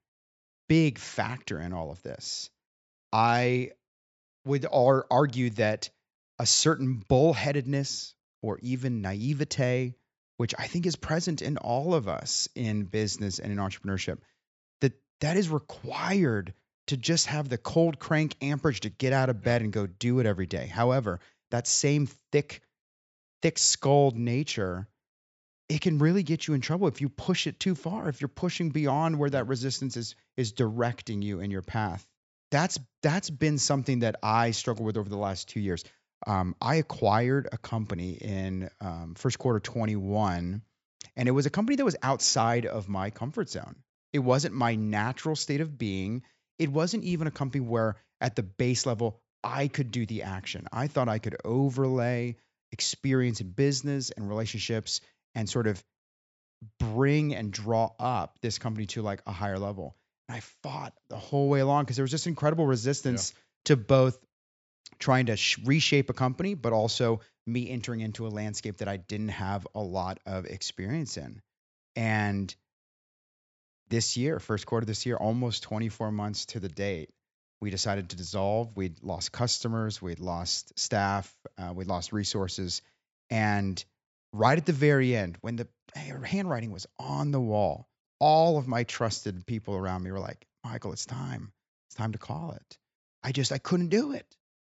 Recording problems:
high frequencies cut off; noticeable; nothing above 8 kHz

